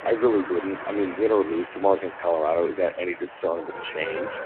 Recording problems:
phone-call audio; poor line
traffic noise; noticeable; throughout; 10 dB below the speech

